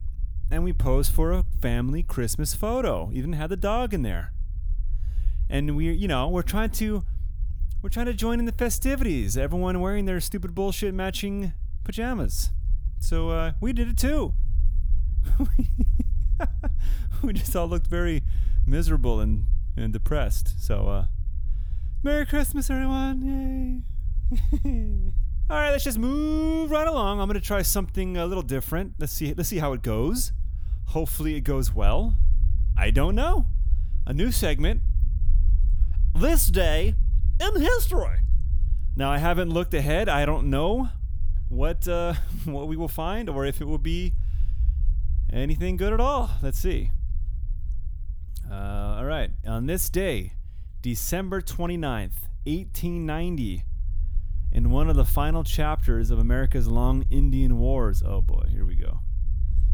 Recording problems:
low rumble; faint; throughout; 20 dB below the speech

